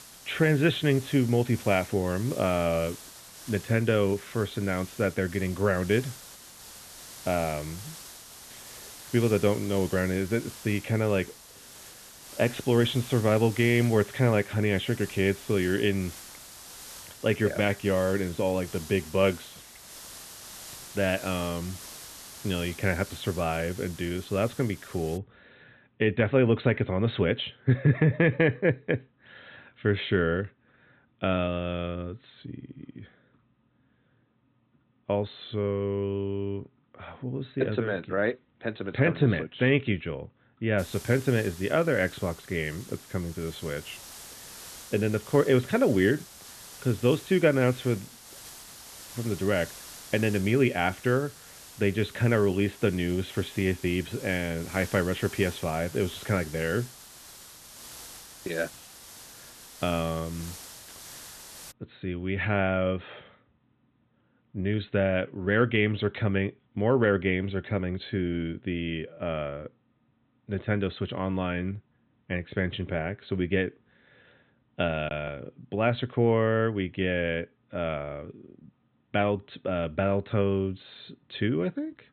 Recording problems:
high frequencies cut off; severe; nothing above 4 kHz
hiss; noticeable; until 25 s and from 41 s to 1:02; 15 dB below the speech

